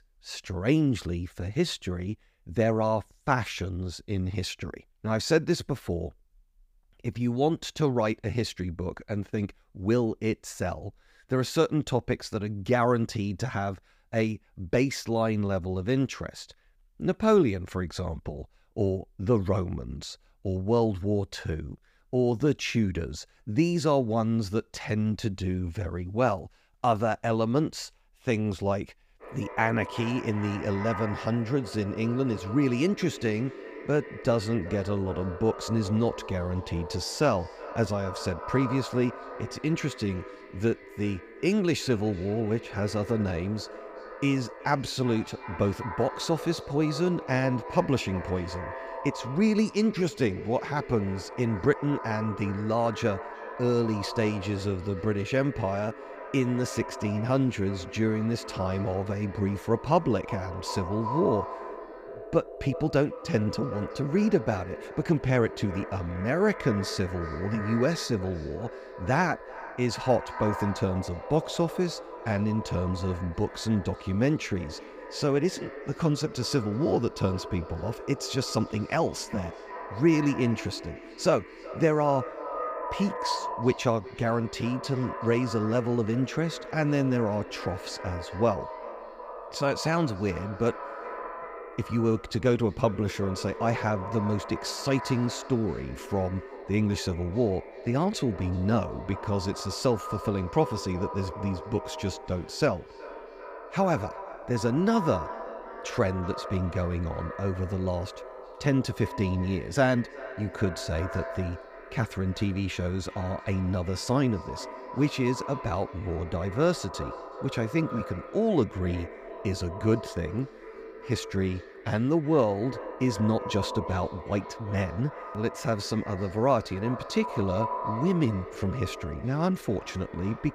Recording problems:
echo of what is said; strong; from 29 s on; 370 ms later, 10 dB below the speech

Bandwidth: 15.5 kHz